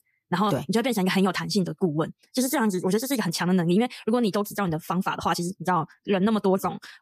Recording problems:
wrong speed, natural pitch; too fast; 1.5 times normal speed

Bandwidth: 14.5 kHz